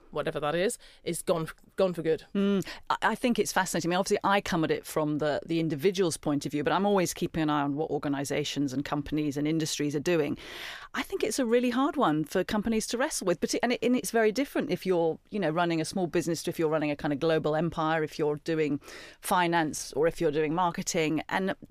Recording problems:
none

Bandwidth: 15 kHz